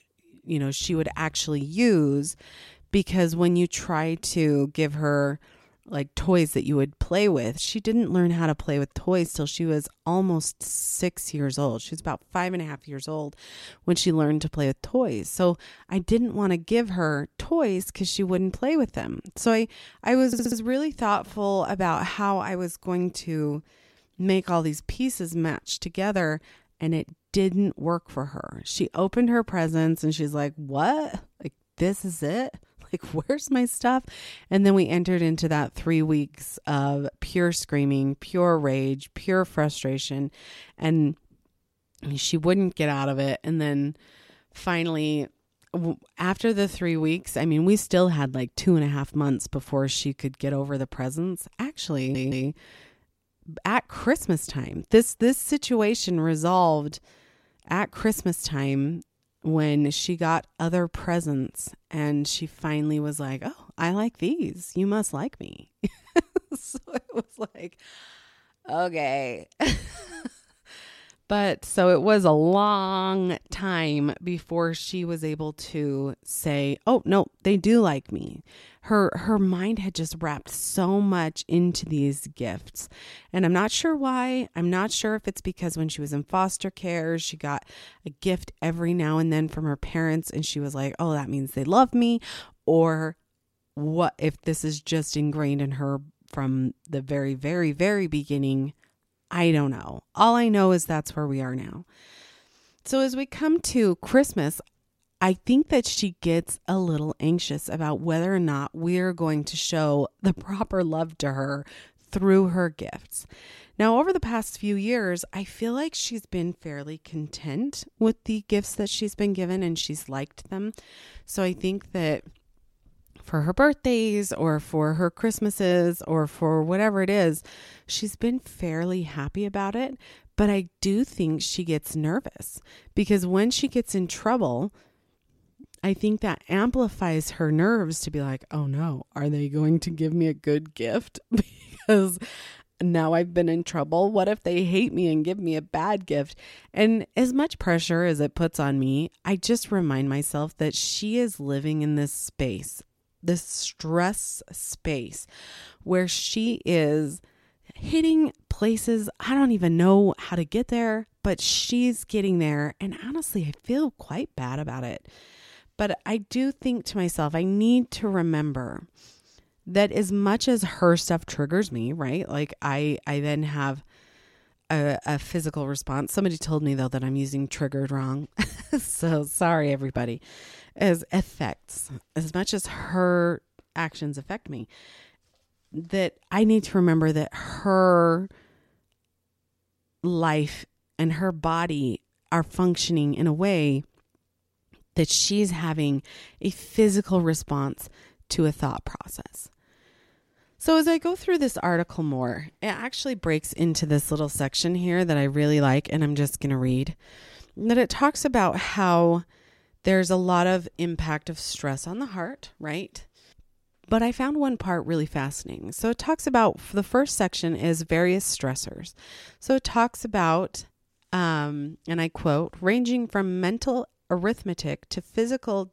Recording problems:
audio stuttering; at 20 s and at 52 s

